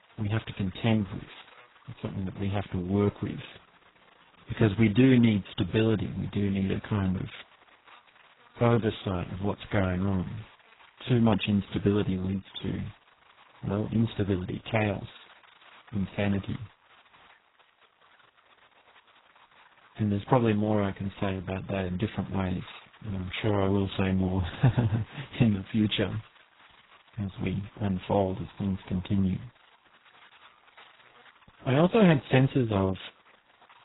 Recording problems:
garbled, watery; badly; nothing above 4 kHz
electrical hum; faint; throughout; 50 Hz, 25 dB below the speech

